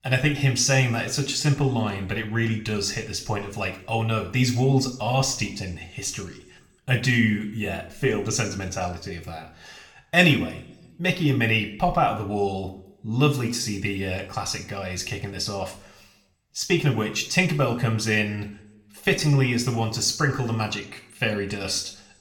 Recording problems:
room echo; slight; dies away in 0.5 s
off-mic speech; somewhat distant

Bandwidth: 17.5 kHz